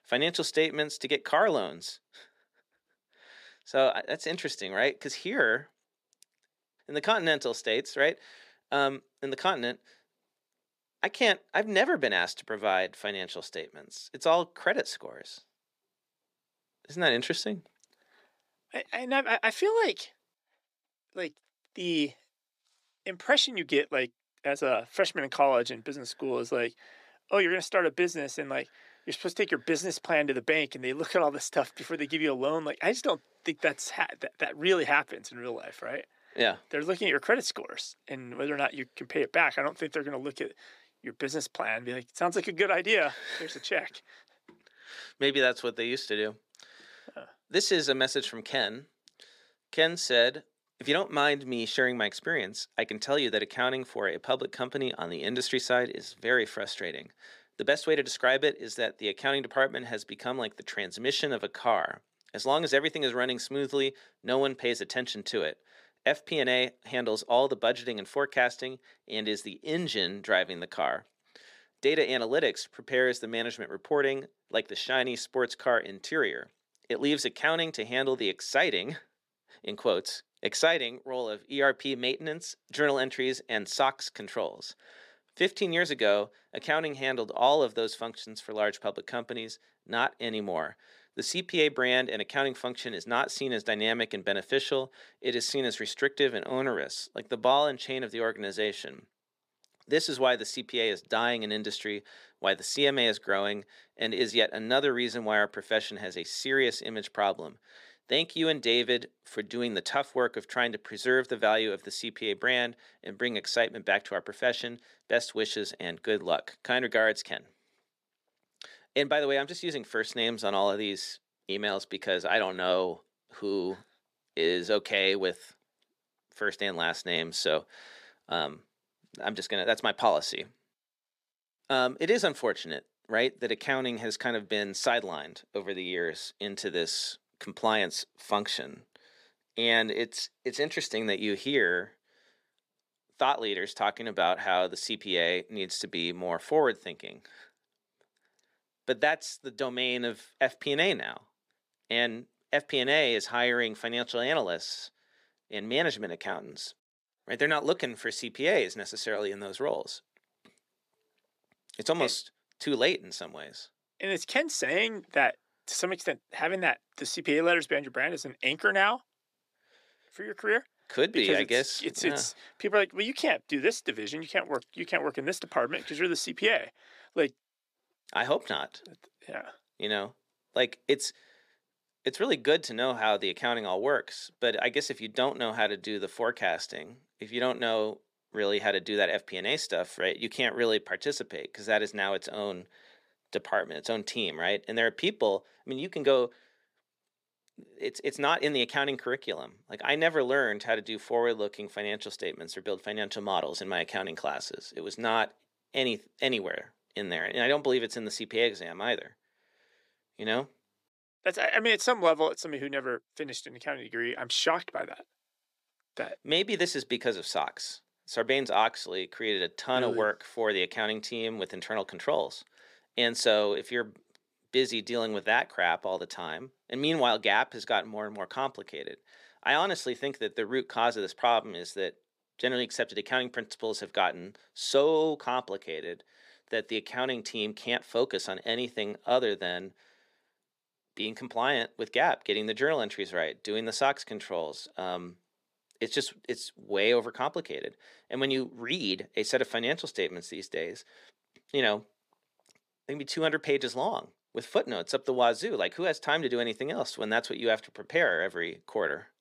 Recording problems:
thin; somewhat; fading below 400 Hz

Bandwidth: 15 kHz